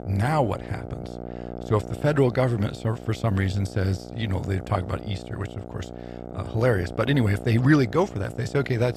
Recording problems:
electrical hum; noticeable; throughout; 60 Hz, 15 dB below the speech

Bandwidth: 14 kHz